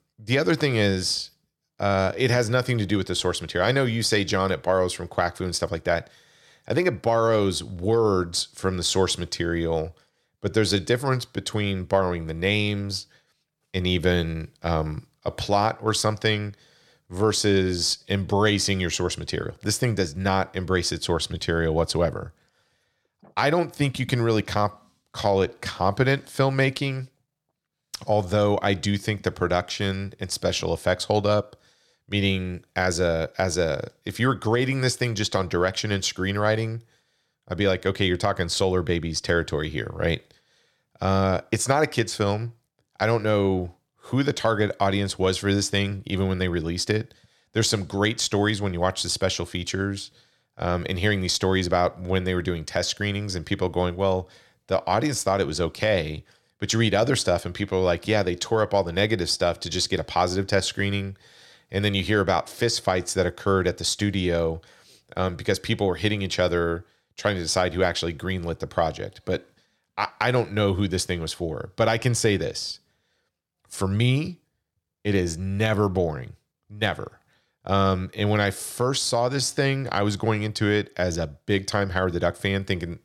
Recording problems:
uneven, jittery; slightly; from 10 s to 1:21

